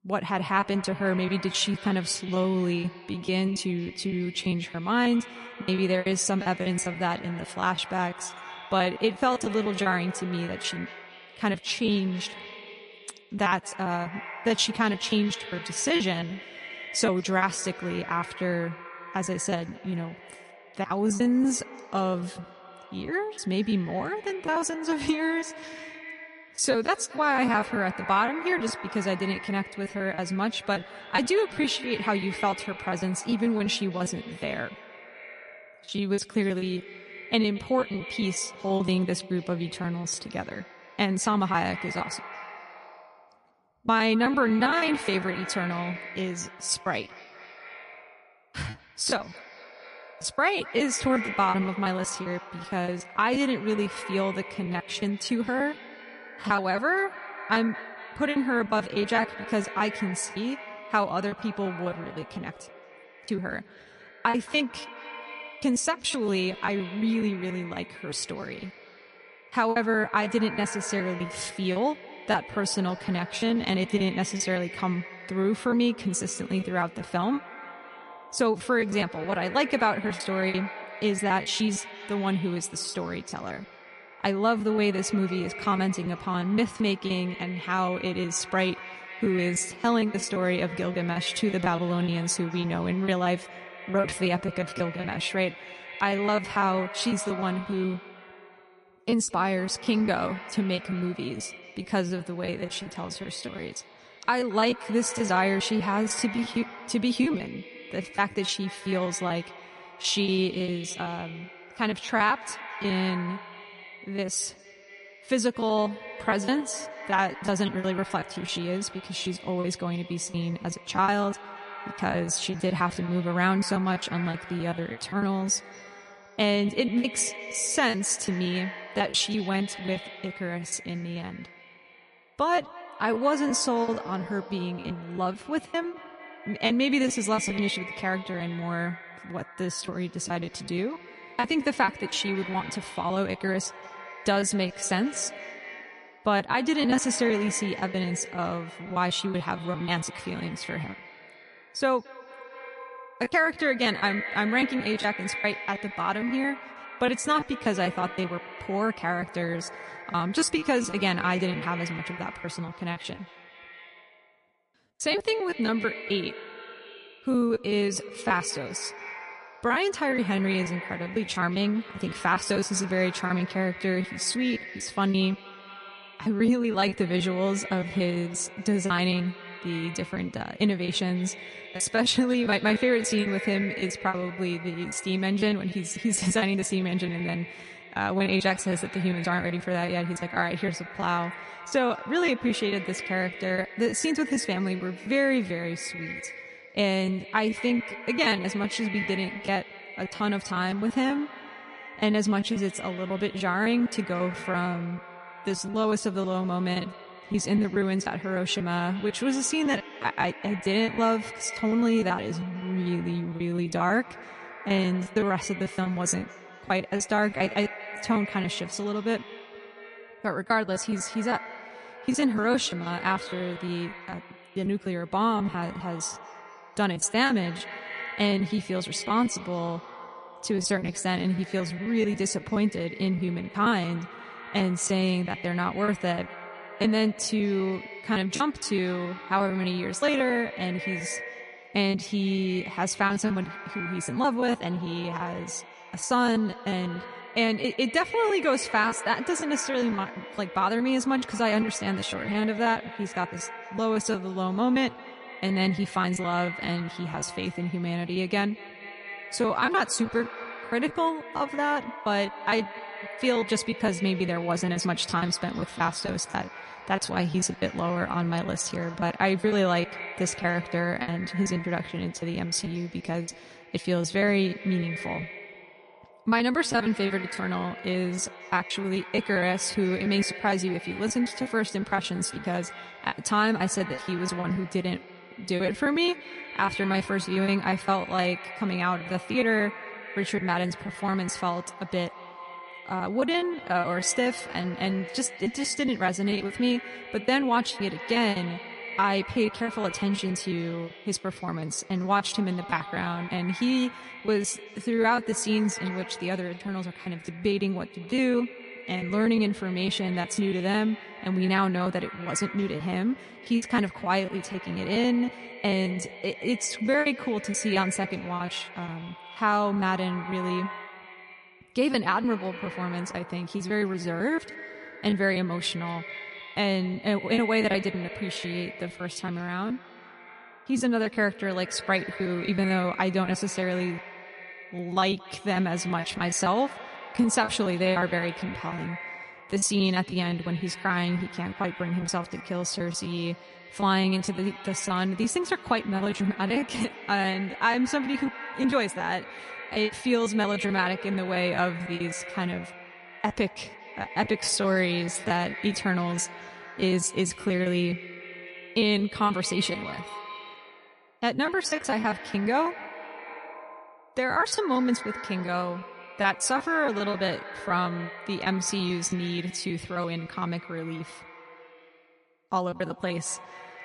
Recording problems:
echo of what is said; noticeable; throughout; 220 ms later, 15 dB below the speech
garbled, watery; slightly; nothing above 10.5 kHz
choppy; very; 16% of the speech affected

